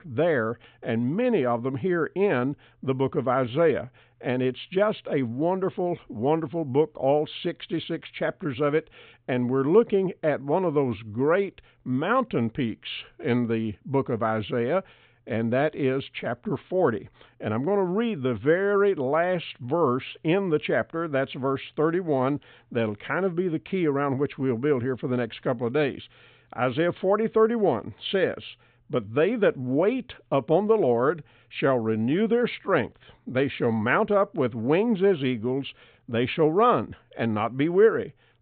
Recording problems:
high frequencies cut off; severe; nothing above 4 kHz

